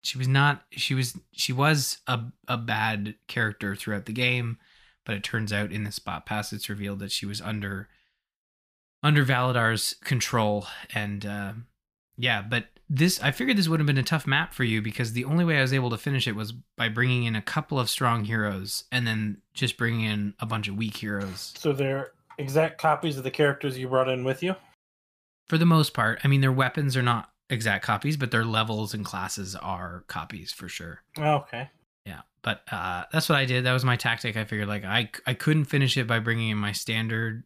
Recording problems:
none

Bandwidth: 15 kHz